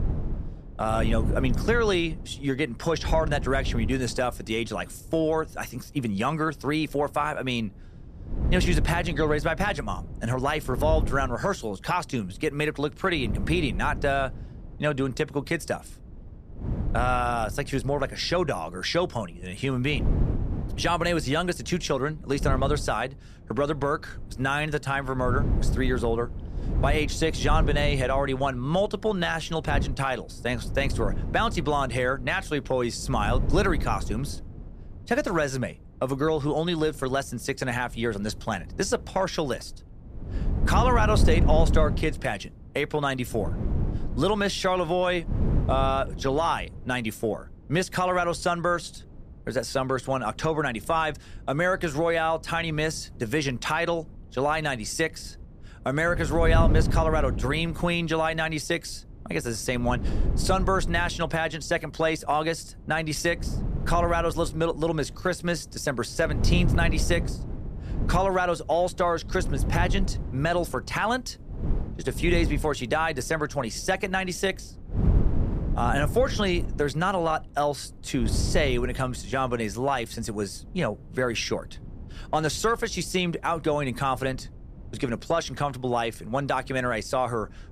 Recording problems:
wind noise on the microphone; occasional gusts; 15 dB below the speech

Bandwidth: 14.5 kHz